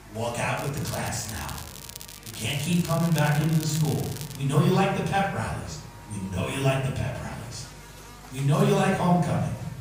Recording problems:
off-mic speech; far
room echo; noticeable; dies away in 0.9 s
electrical hum; noticeable; throughout; 50 Hz, 15 dB below the speech
crackling; noticeable; from 0.5 to 4.5 s; 15 dB below the speech
murmuring crowd; faint; throughout; 30 dB below the speech

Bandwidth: 15.5 kHz